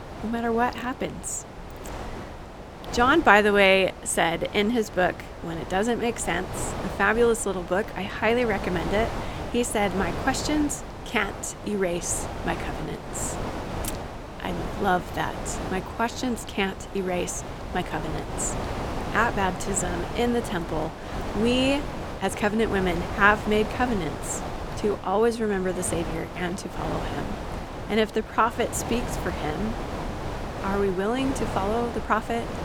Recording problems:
wind noise on the microphone; heavy; 10 dB below the speech

